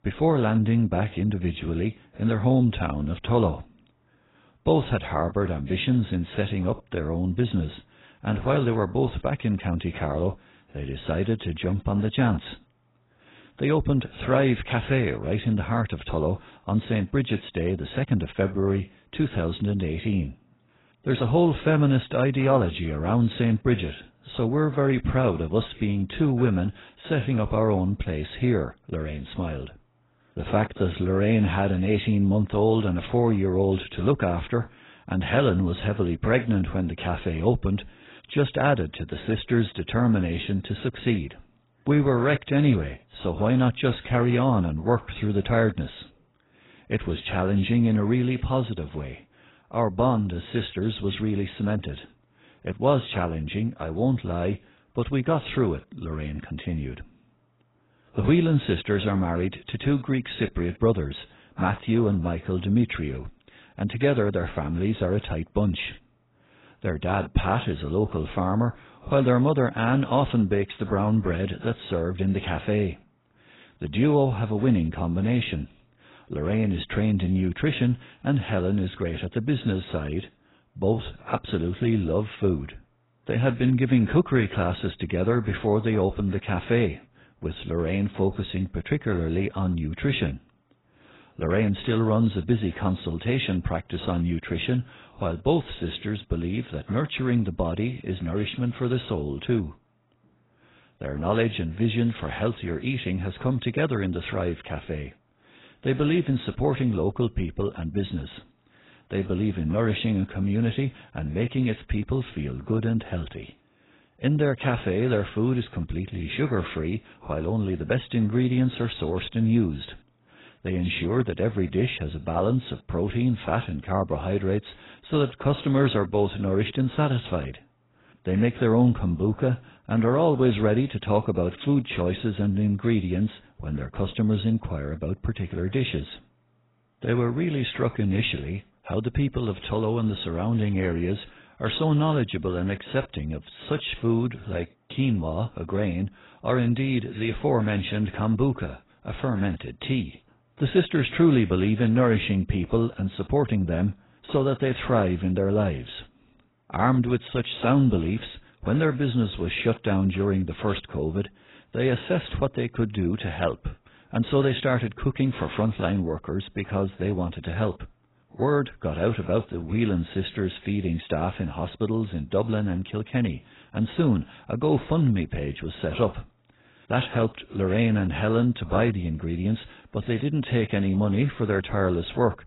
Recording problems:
garbled, watery; badly; nothing above 4 kHz

